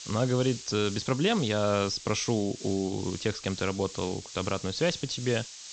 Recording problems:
high frequencies cut off; noticeable; nothing above 8 kHz
hiss; noticeable; throughout; 10 dB below the speech

